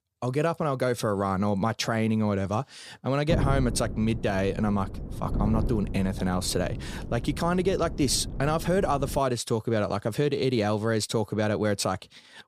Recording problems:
wind noise on the microphone; occasional gusts; from 3.5 to 9 s; 15 dB below the speech

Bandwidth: 15 kHz